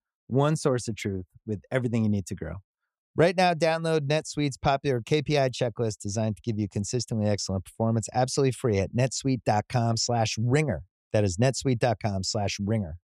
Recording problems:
none

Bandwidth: 15 kHz